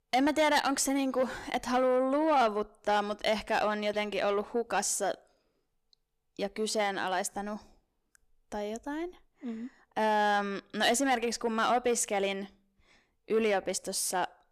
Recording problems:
distortion; slight; 10 dB below the speech

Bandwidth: 14.5 kHz